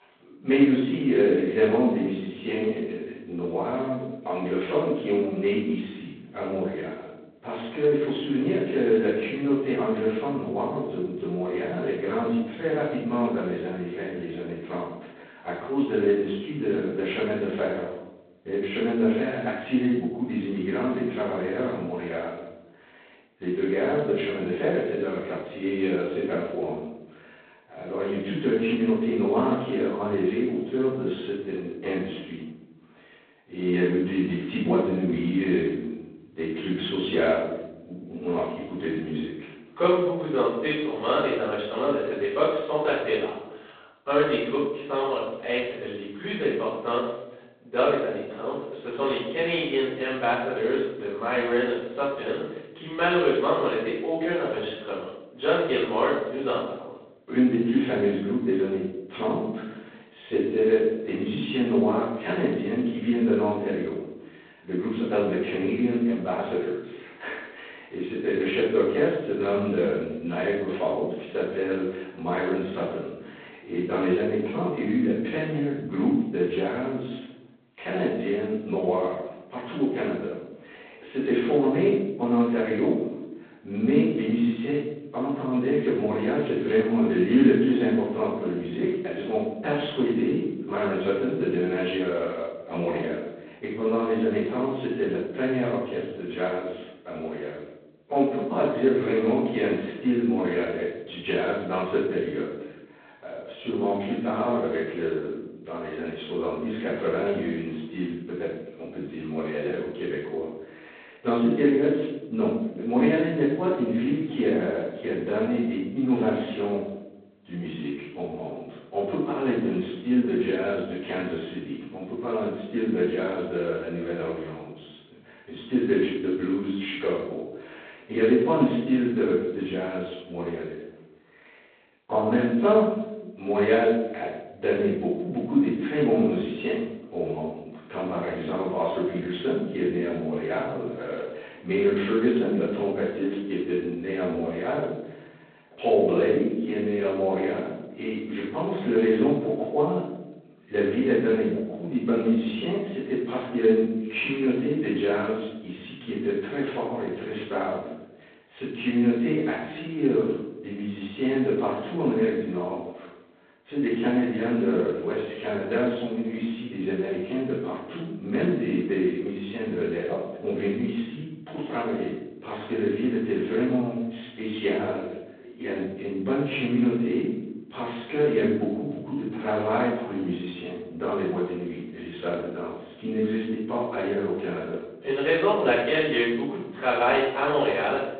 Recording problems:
phone-call audio; poor line; nothing above 3.5 kHz
off-mic speech; far
room echo; noticeable; dies away in 0.8 s

